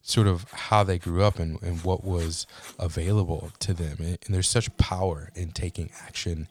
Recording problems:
household noises; faint; throughout; 25 dB below the speech

